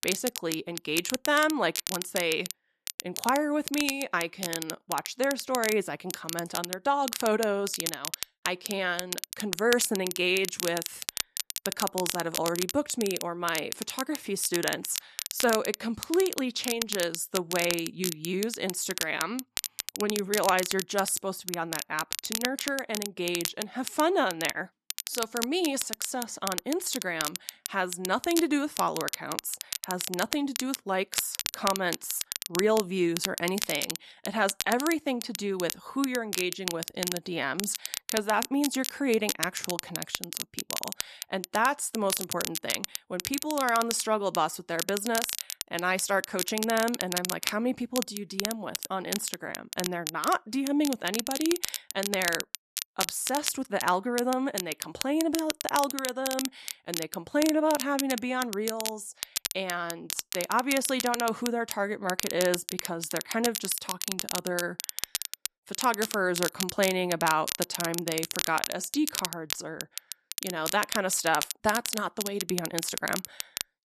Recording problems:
crackle, like an old record; loud; 4 dB below the speech

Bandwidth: 14 kHz